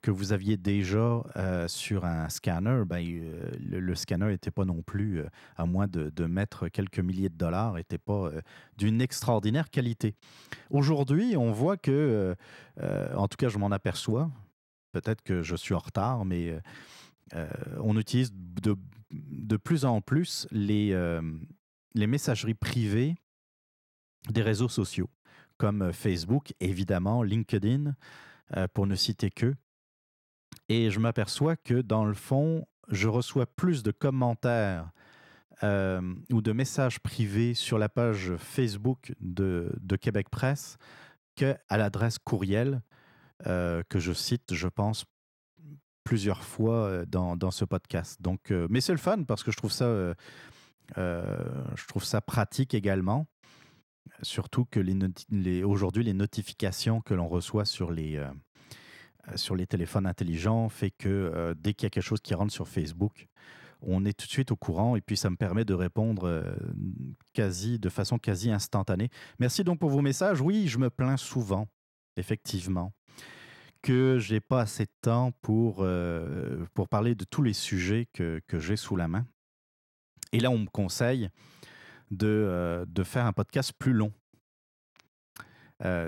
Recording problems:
abrupt cut into speech; at the end

